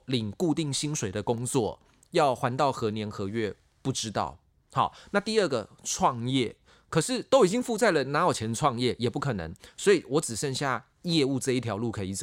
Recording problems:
abrupt cut into speech; at the end

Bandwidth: 16 kHz